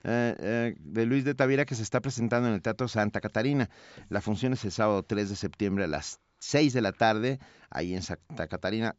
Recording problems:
high frequencies cut off; noticeable; nothing above 8 kHz

